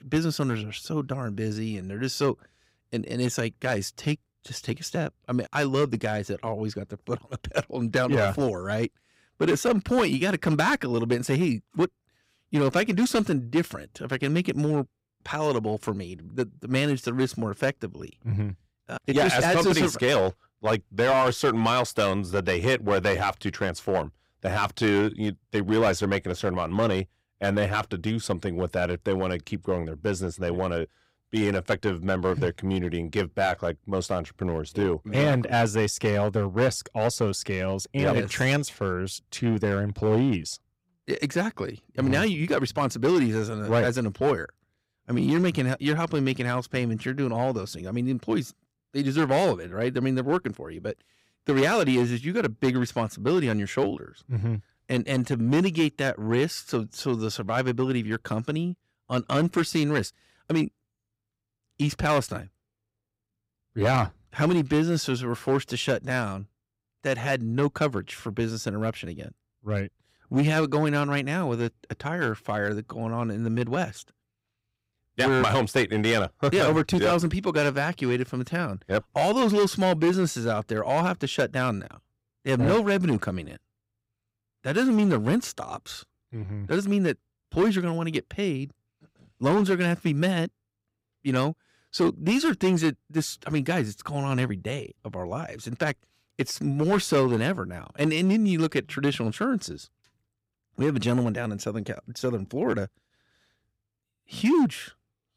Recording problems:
distortion; slight; 4% of the sound clipped

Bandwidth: 15.5 kHz